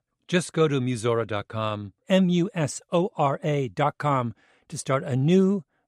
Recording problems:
none

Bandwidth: 14.5 kHz